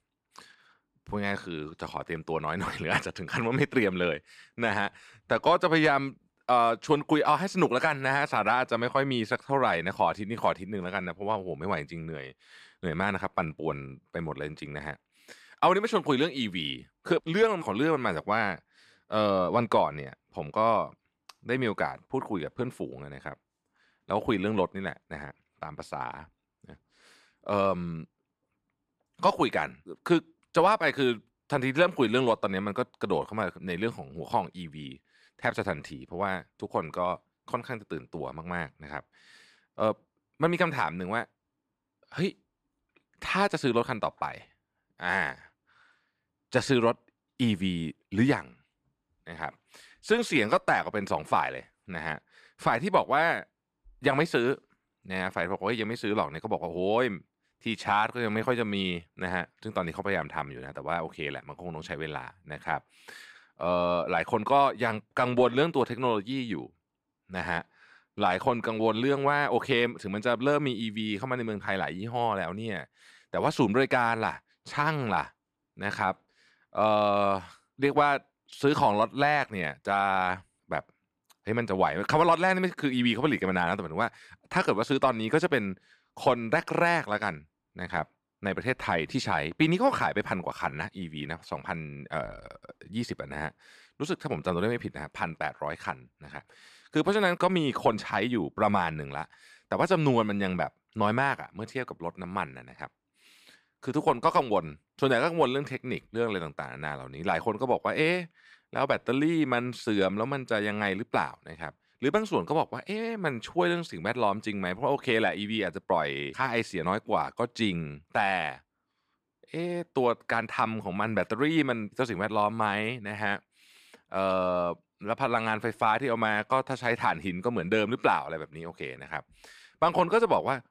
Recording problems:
none

